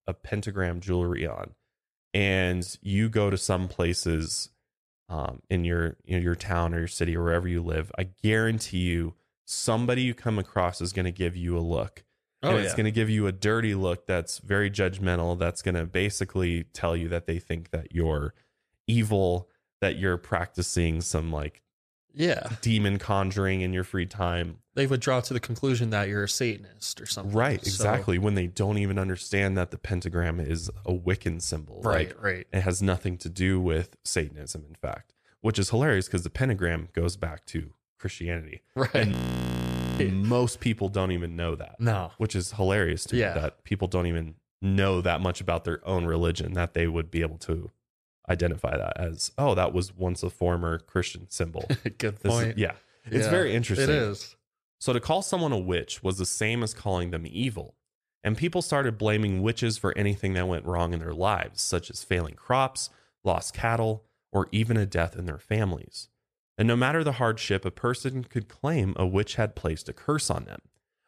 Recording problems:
audio freezing; at 39 s for 1 s

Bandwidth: 14.5 kHz